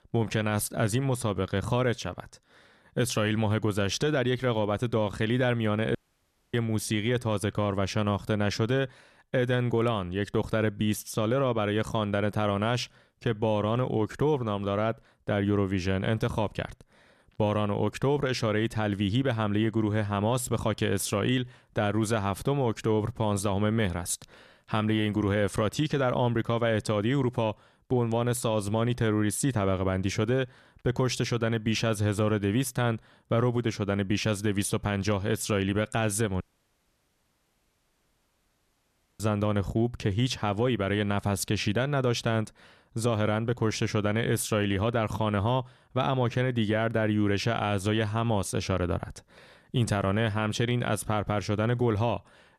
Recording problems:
audio cutting out; at 6 s for 0.5 s and at 36 s for 3 s

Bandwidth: 13.5 kHz